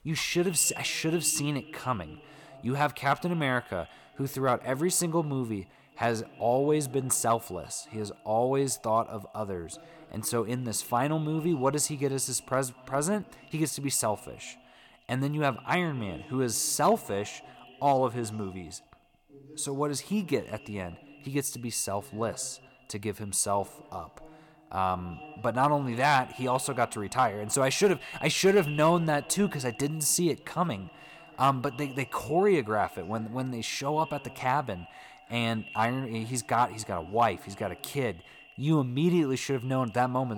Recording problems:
echo of what is said; faint; throughout; 100 ms later, 20 dB below the speech
voice in the background; faint; throughout; 25 dB below the speech
abrupt cut into speech; at the end

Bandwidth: 17 kHz